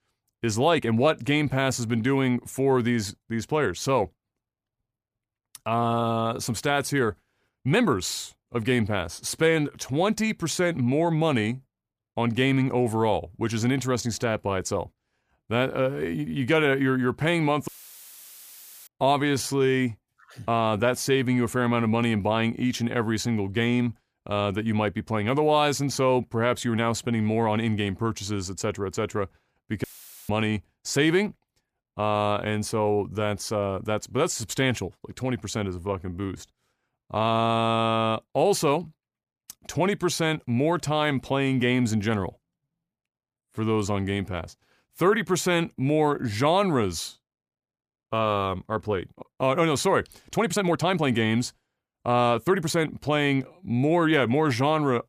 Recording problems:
uneven, jittery; strongly; from 0.5 to 53 s
audio cutting out; filled with static; at 18 s for 1 s and at 30 s

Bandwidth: 15 kHz